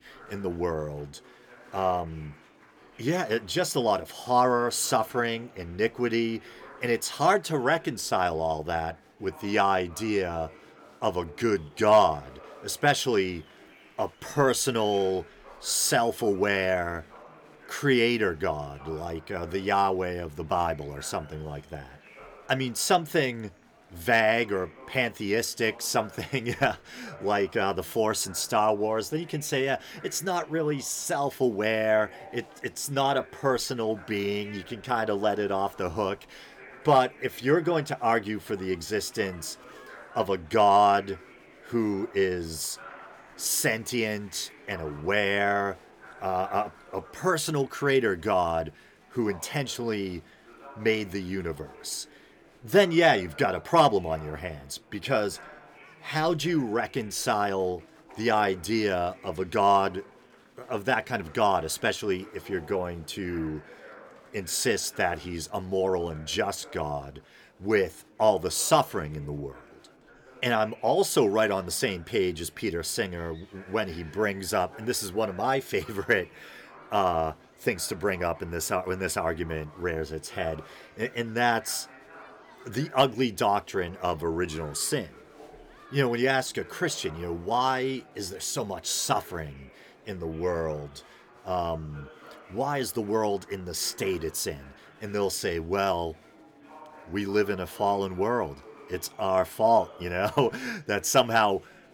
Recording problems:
murmuring crowd; faint; throughout; 25 dB below the speech

